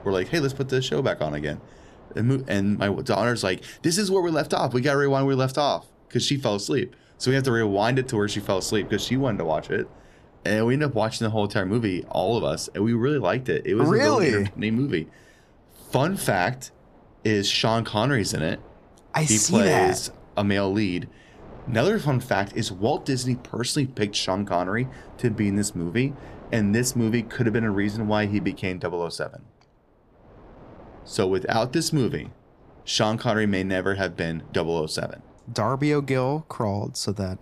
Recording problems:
wind noise on the microphone; occasional gusts; 25 dB below the speech

